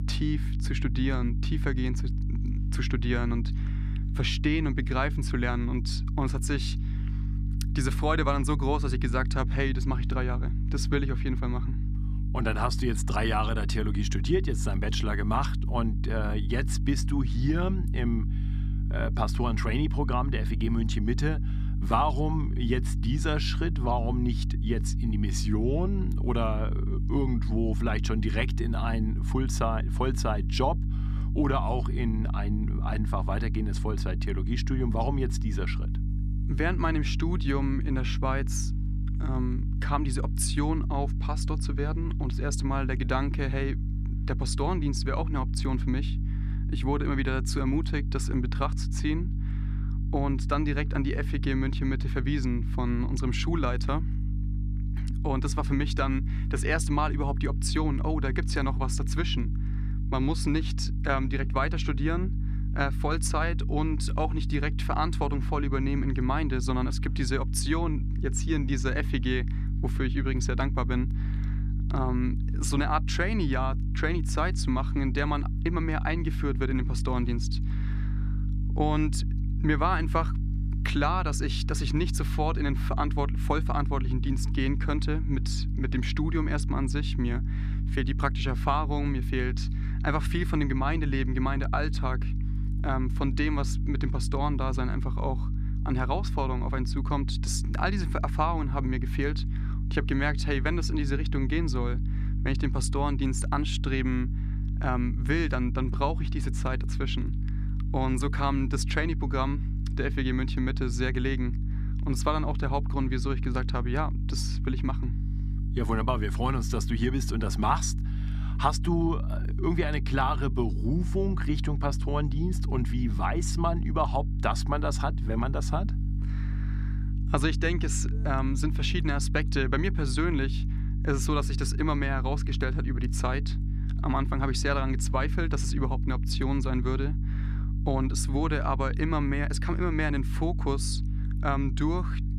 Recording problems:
electrical hum; noticeable; throughout; 50 Hz, 15 dB below the speech

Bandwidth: 14.5 kHz